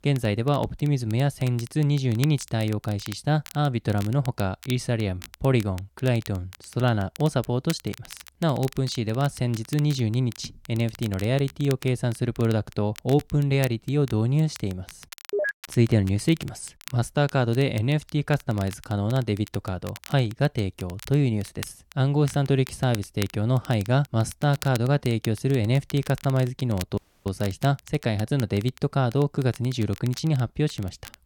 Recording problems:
crackle, like an old record; noticeable; 20 dB below the speech
audio cutting out; at 27 s

